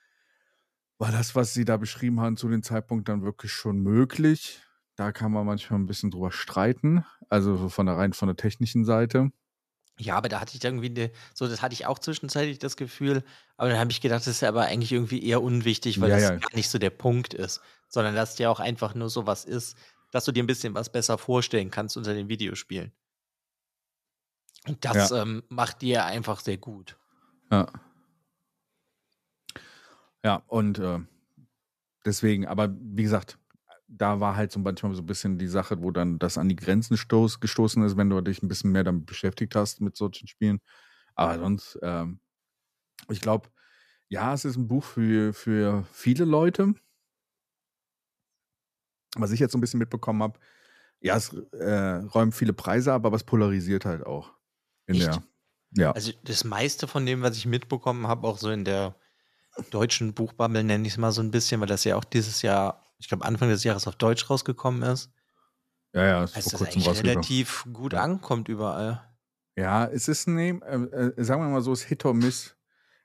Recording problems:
uneven, jittery; strongly; from 3 s to 1:11

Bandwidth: 14.5 kHz